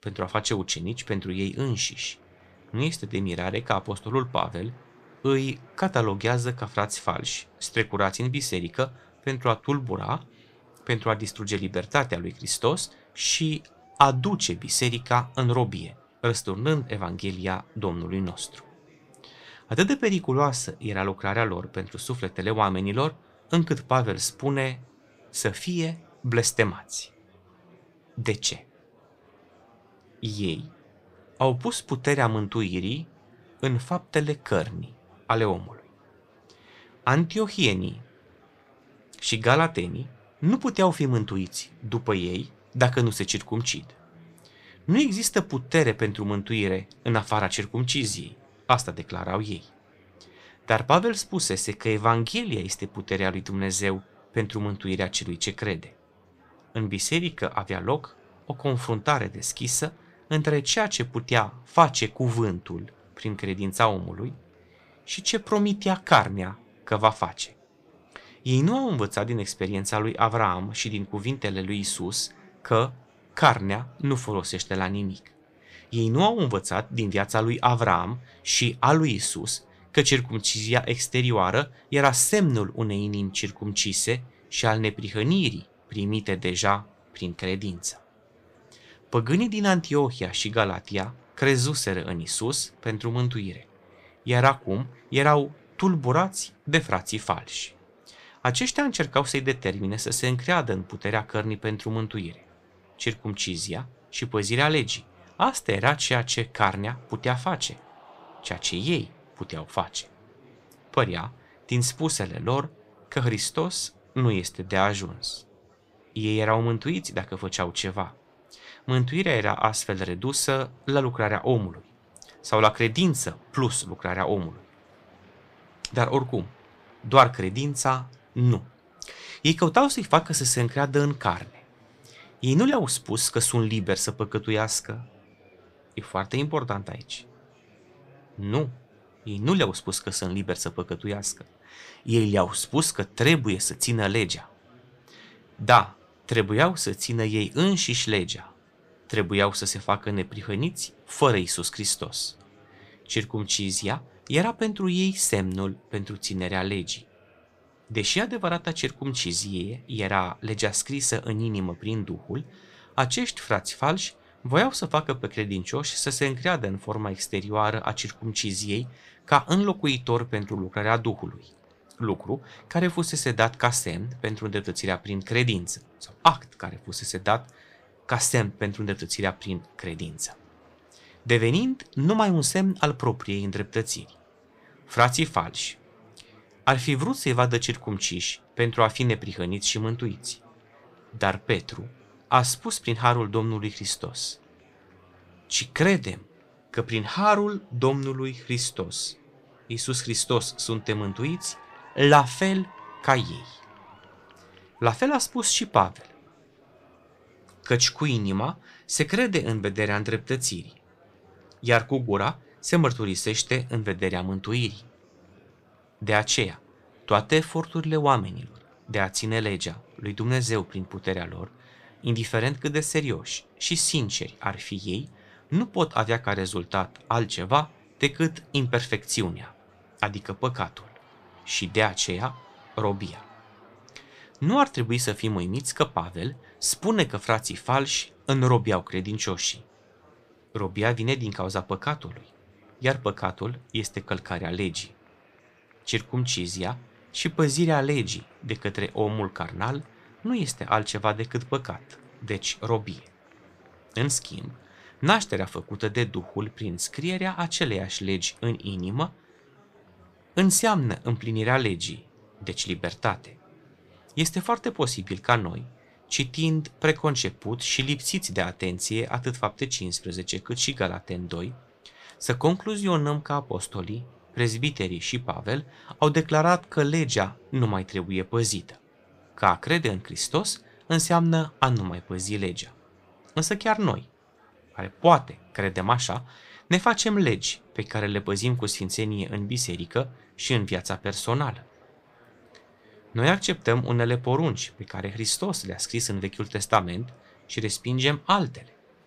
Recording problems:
murmuring crowd; faint; throughout; 30 dB below the speech

